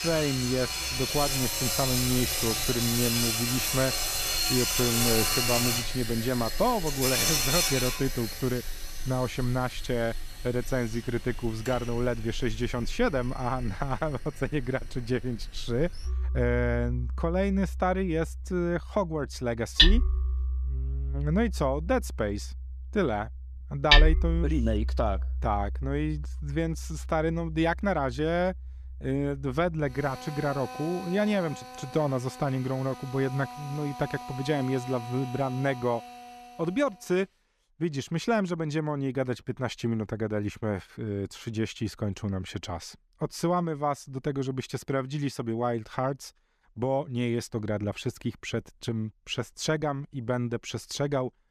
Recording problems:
machinery noise; very loud; until 37 s; 1 dB above the speech

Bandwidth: 14.5 kHz